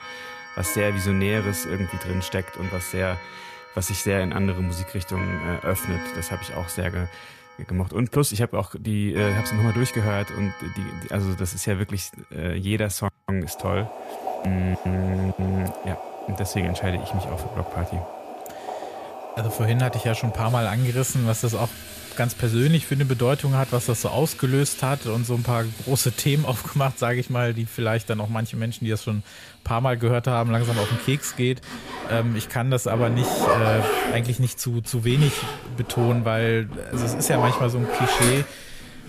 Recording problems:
household noises; loud; throughout; 7 dB below the speech

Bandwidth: 14.5 kHz